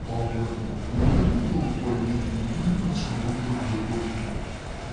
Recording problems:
room echo; strong; dies away in 1 s
off-mic speech; far
wrong speed and pitch; too slow and too low; 0.6 times normal speed
wind noise on the microphone; heavy; 5 dB below the speech
crowd noise; loud; throughout; 10 dB below the speech
chatter from many people; noticeable; throughout; 15 dB below the speech

